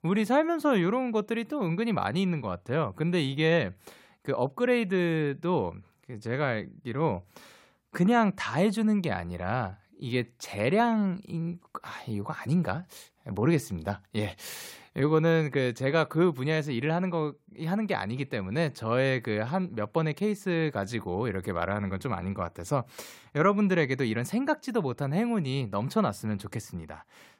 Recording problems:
none

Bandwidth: 16 kHz